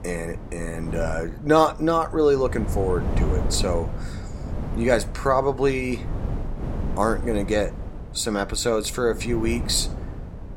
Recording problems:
wind noise on the microphone; occasional gusts; 15 dB below the speech

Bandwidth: 16 kHz